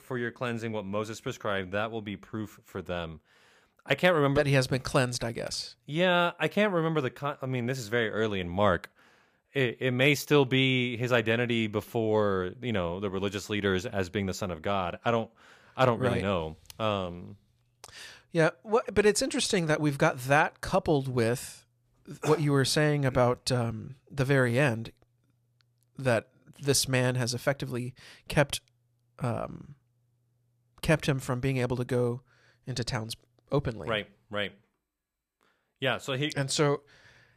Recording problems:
none

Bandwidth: 15 kHz